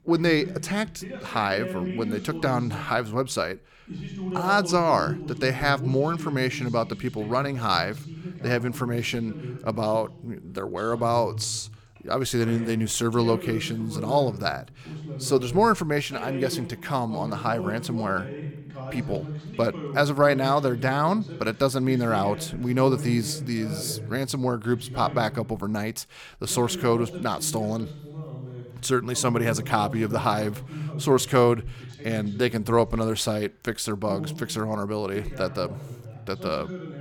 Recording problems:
voice in the background; noticeable; throughout; 10 dB below the speech

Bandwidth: 18.5 kHz